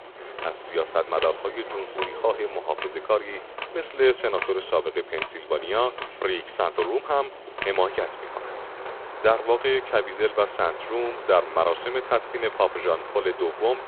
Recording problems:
phone-call audio; poor line
rain or running water; noticeable; throughout; 10 dB below the speech
traffic noise; noticeable; throughout; 20 dB below the speech

